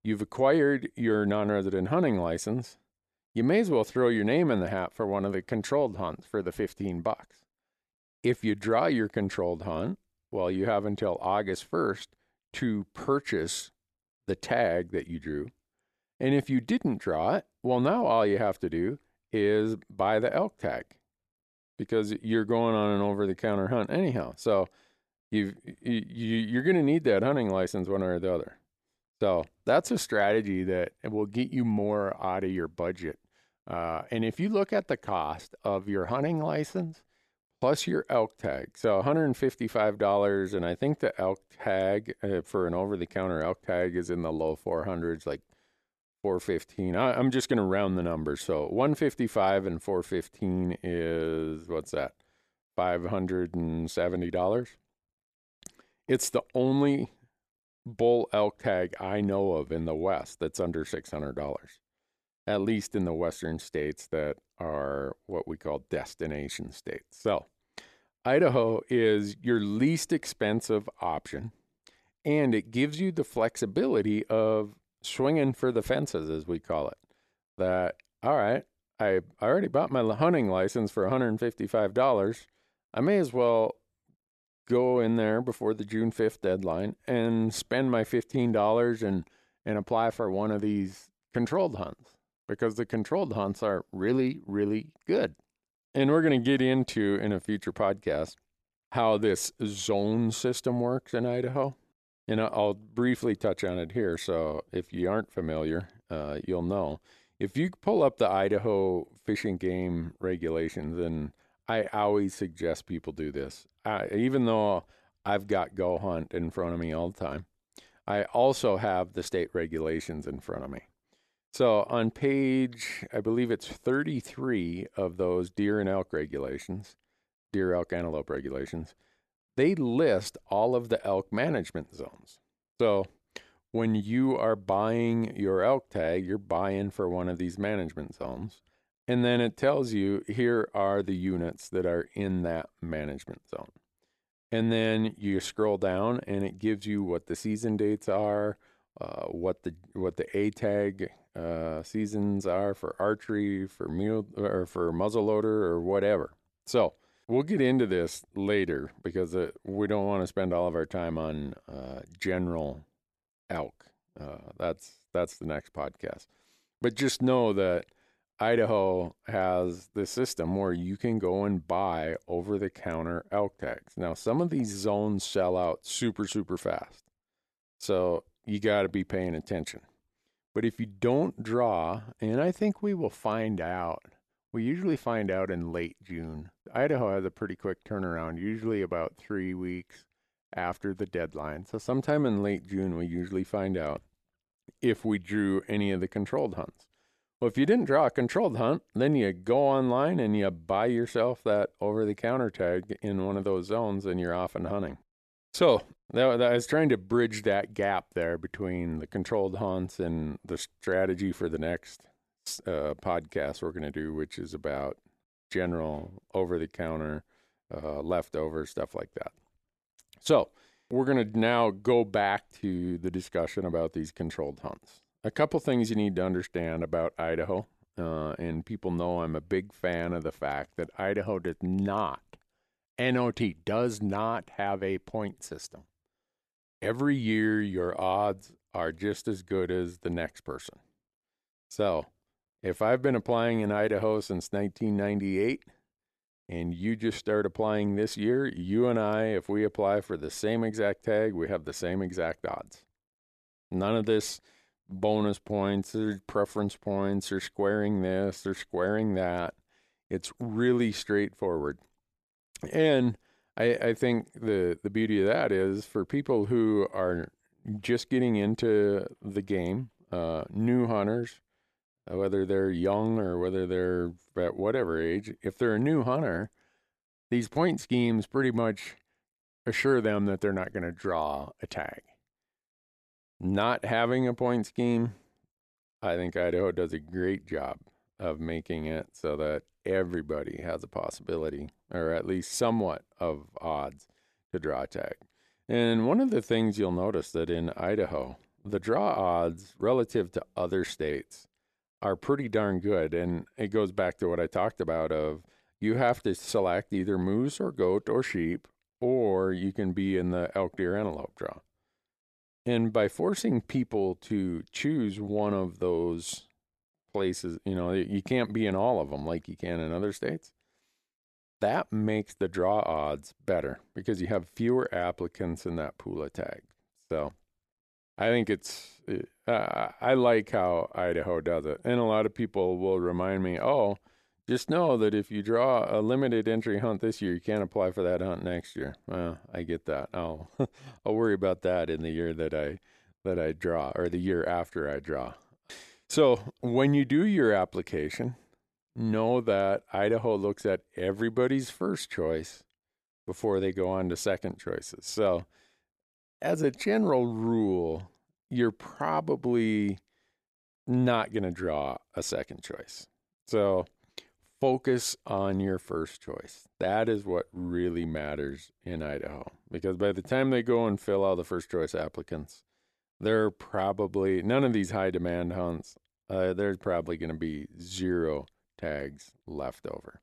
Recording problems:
none

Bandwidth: 13.5 kHz